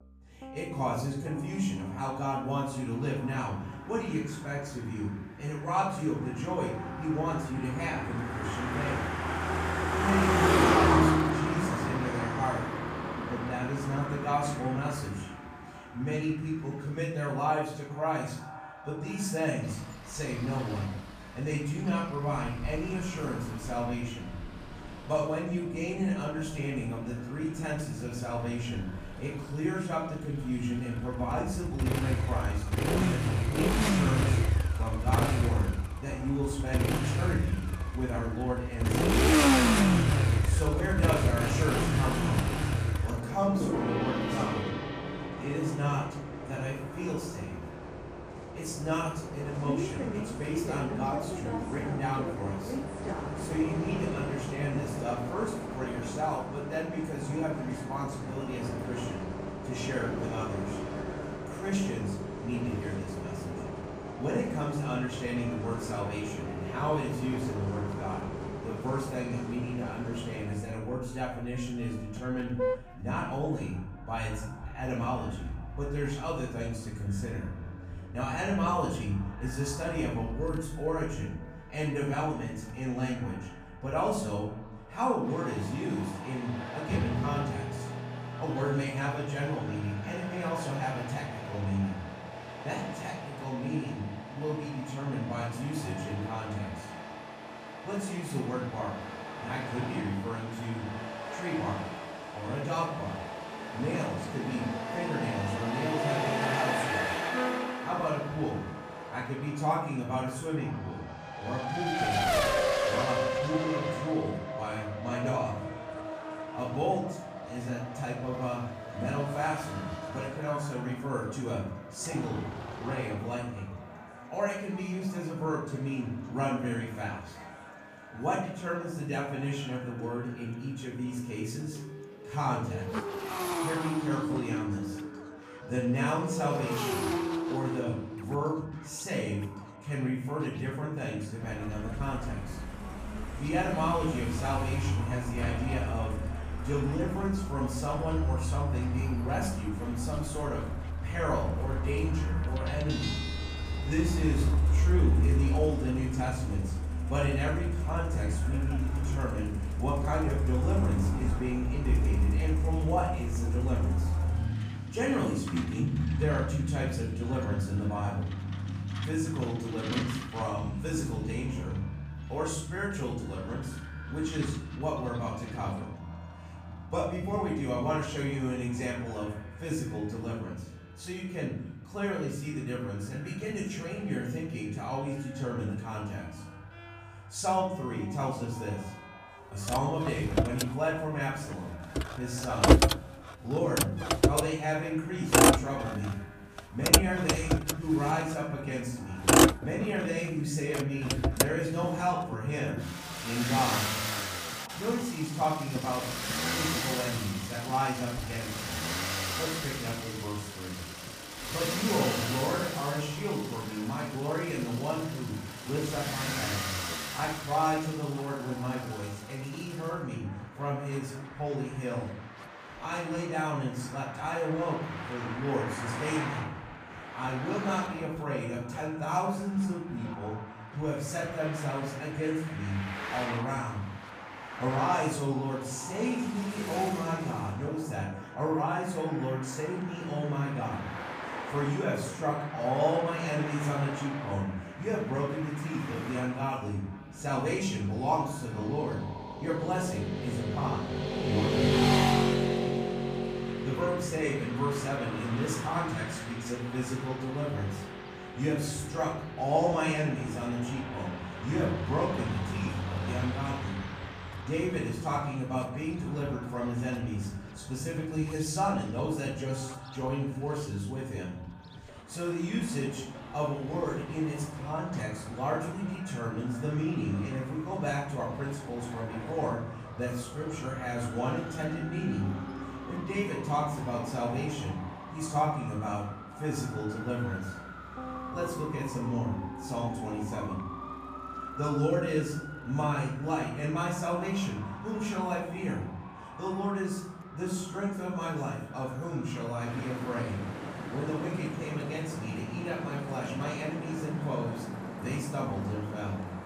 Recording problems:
off-mic speech; far
room echo; noticeable; dies away in 0.7 s
echo of what is said; faint; throughout; 450 ms later, 20 dB below the speech
traffic noise; very loud; throughout; as loud as the speech
background music; noticeable; throughout; 15 dB below the speech

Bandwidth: 15 kHz